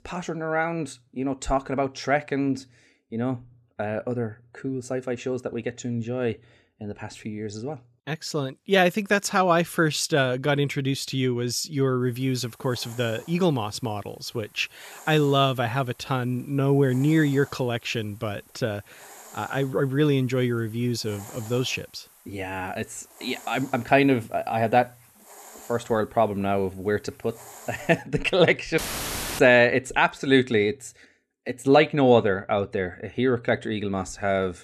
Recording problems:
hiss; faint; from 12 to 28 s; 25 dB below the speech
audio cutting out; filled with static; at 29 s for 0.5 s

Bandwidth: 13.5 kHz